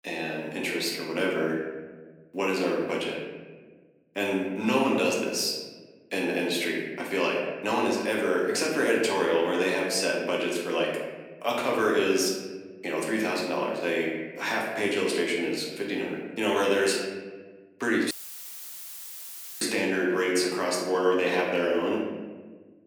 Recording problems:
off-mic speech; far
room echo; noticeable; dies away in 1.2 s
thin; very slightly; fading below 250 Hz
audio cutting out; filled with static; at 18 s for 1.5 s

